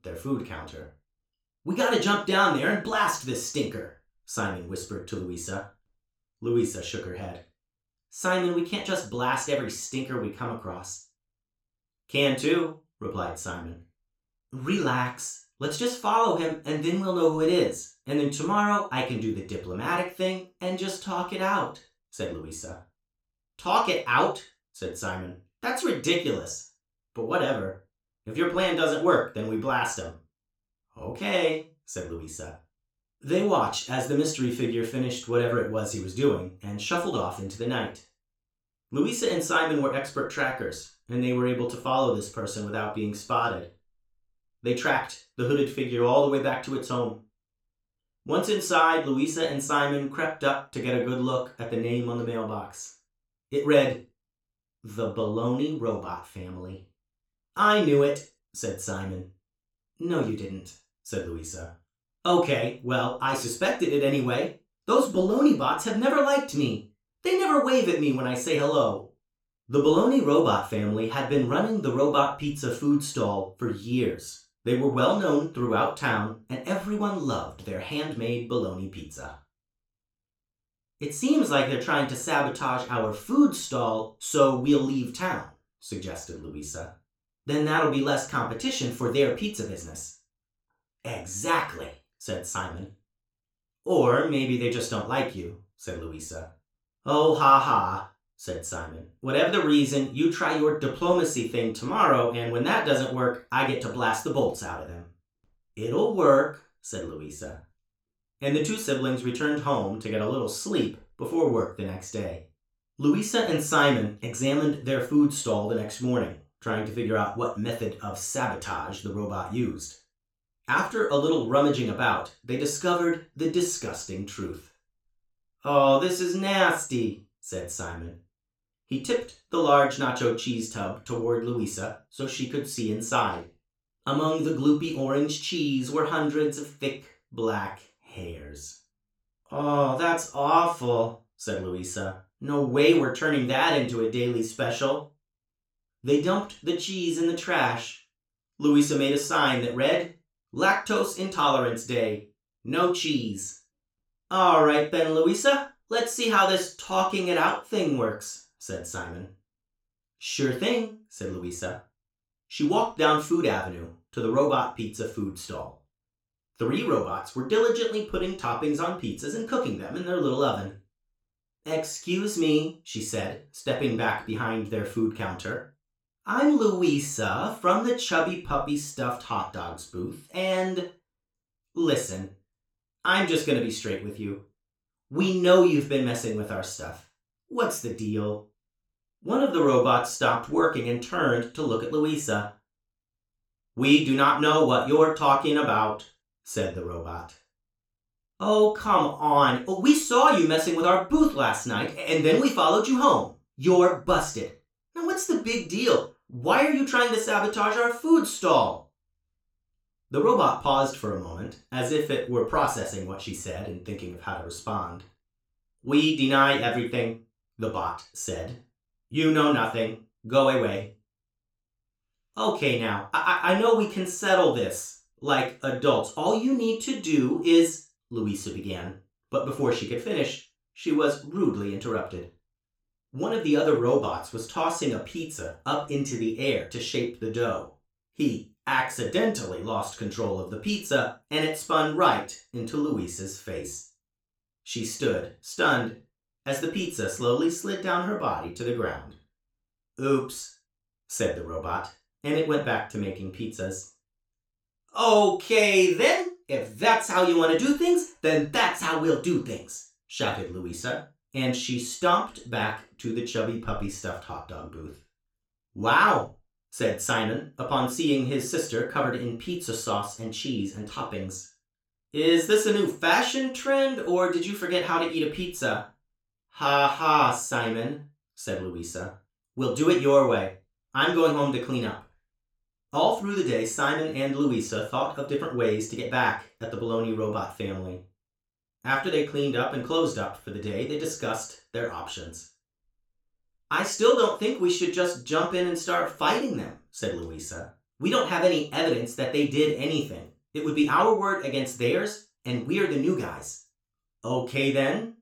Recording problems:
off-mic speech; far
room echo; noticeable; dies away in 0.3 s

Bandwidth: 18.5 kHz